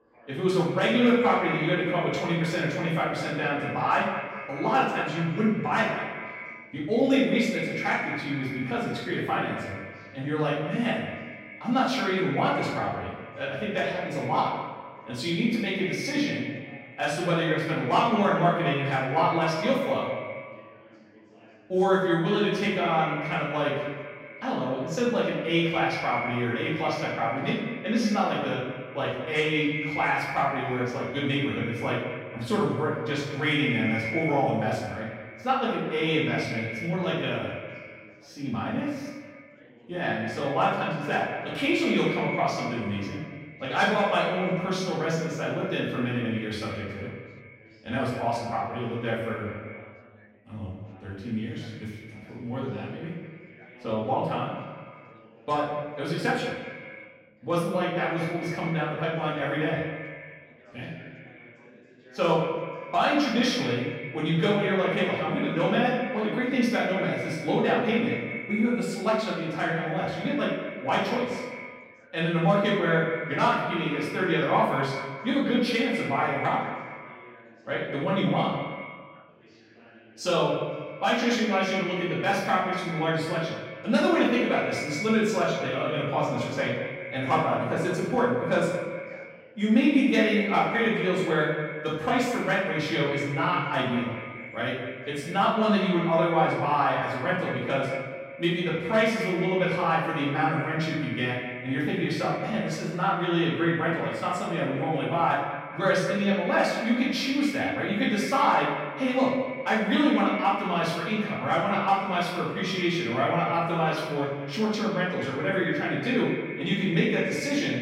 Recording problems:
echo of what is said; strong; throughout; 190 ms later, 9 dB below the speech
off-mic speech; far
room echo; noticeable; dies away in 0.9 s
background chatter; faint; throughout; 4 voices, 25 dB below the speech

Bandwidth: 16.5 kHz